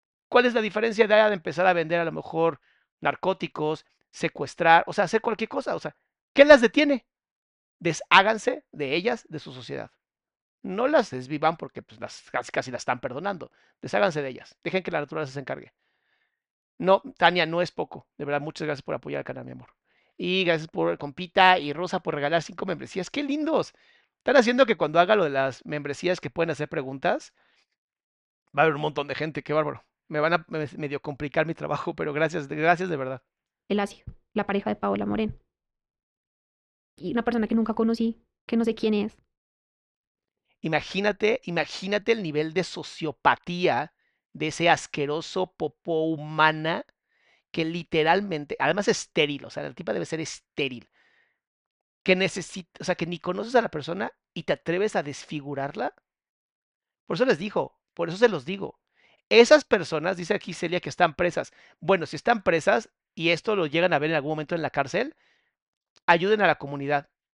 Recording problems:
muffled; slightly; fading above 3 kHz

